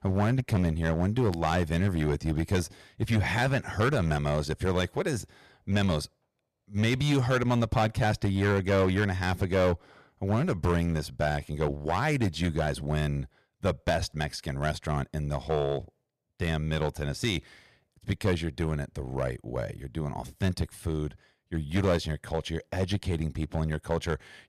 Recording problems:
distortion; slight; 5% of the sound clipped

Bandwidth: 14.5 kHz